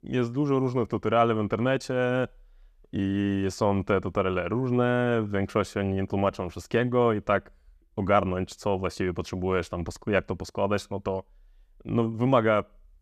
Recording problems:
none

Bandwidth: 14.5 kHz